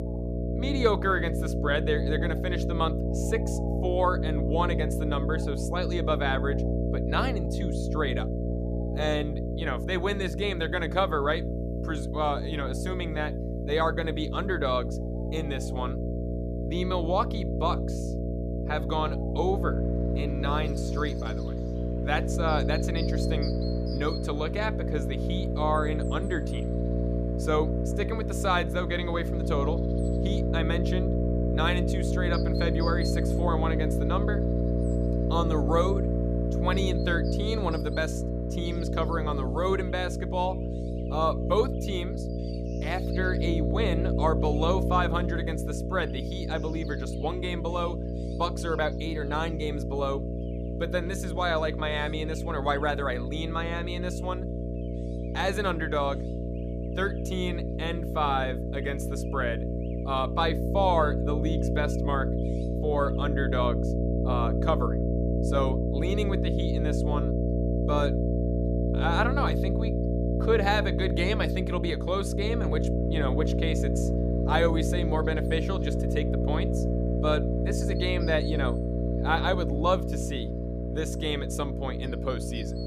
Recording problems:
electrical hum; loud; throughout; 60 Hz, 5 dB below the speech
animal sounds; faint; throughout; 20 dB below the speech

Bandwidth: 15 kHz